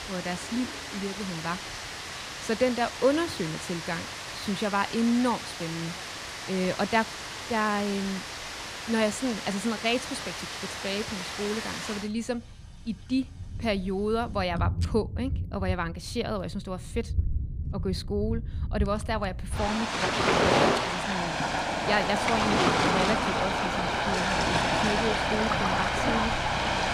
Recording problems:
rain or running water; very loud; throughout; 1 dB above the speech
household noises; faint; throughout; 20 dB below the speech

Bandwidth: 15 kHz